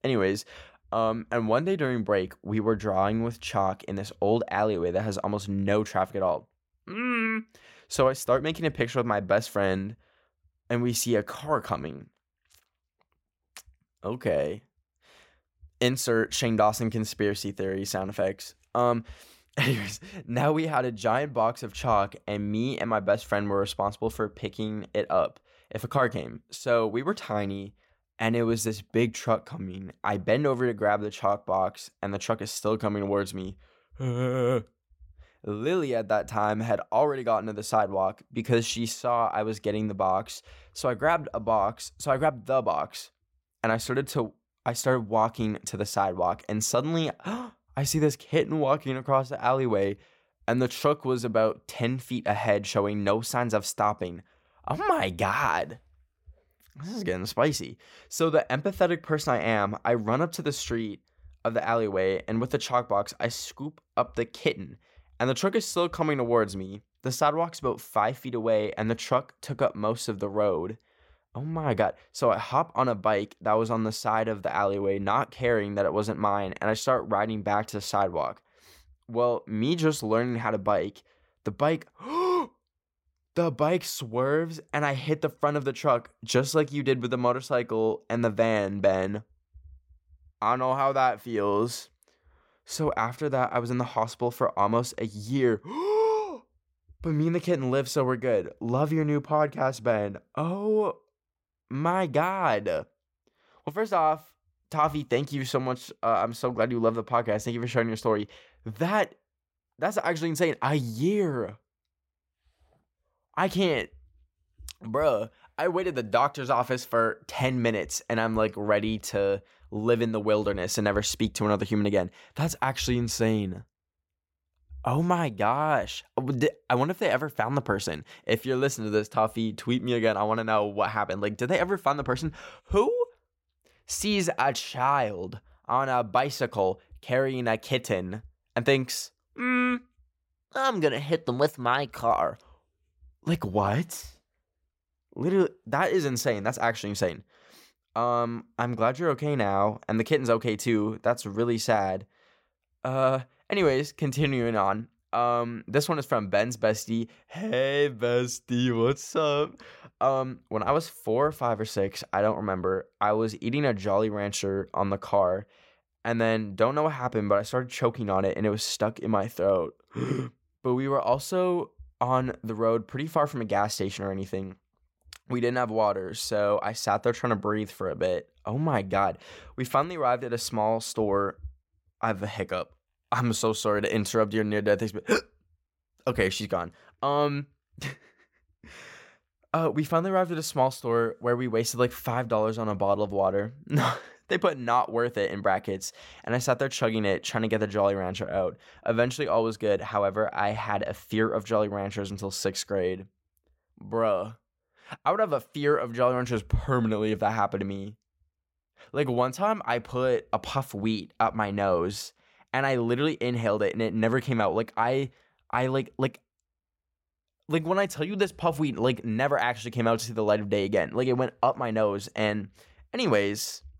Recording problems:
none

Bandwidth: 16.5 kHz